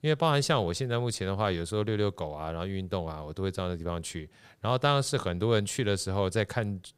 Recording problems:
none

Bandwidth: 15.5 kHz